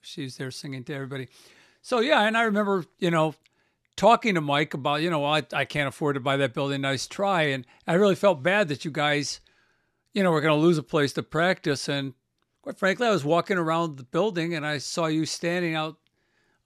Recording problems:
none

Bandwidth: 13.5 kHz